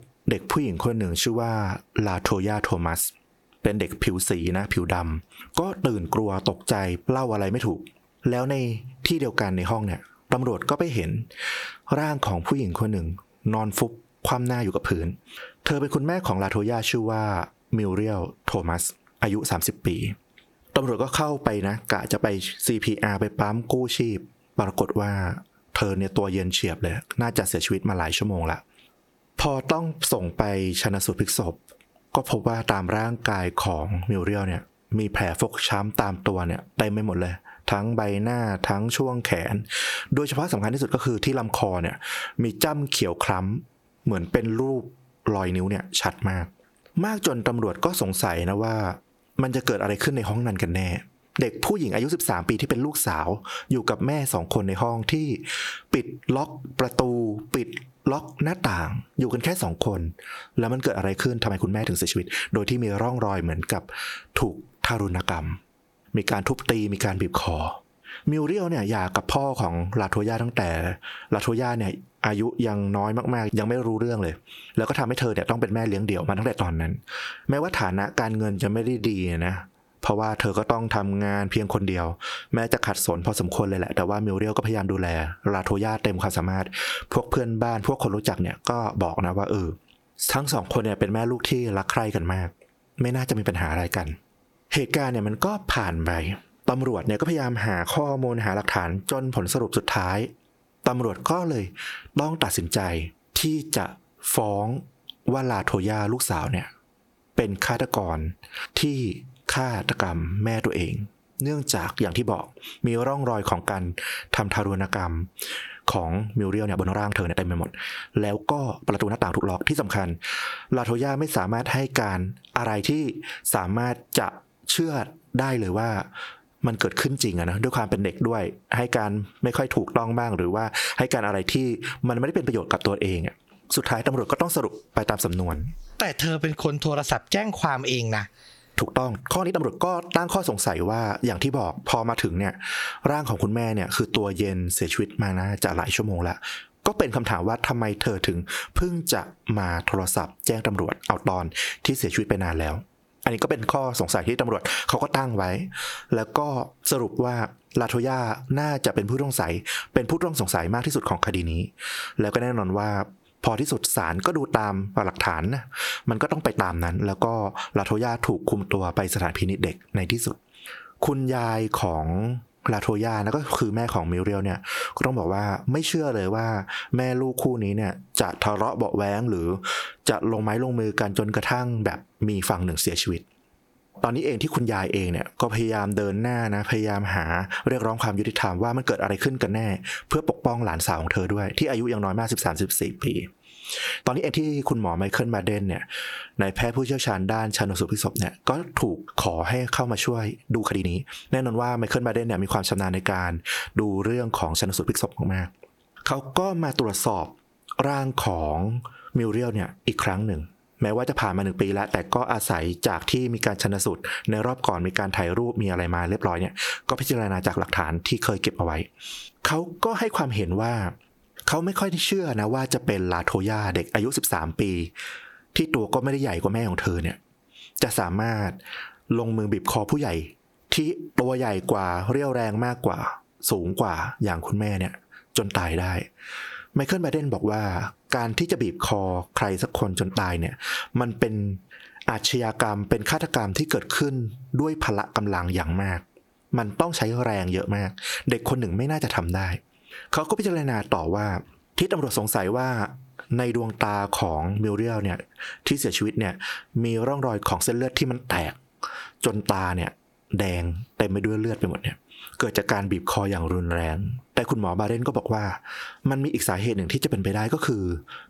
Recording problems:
squashed, flat; heavily
uneven, jittery; strongly; from 27 s to 3:56

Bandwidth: 18.5 kHz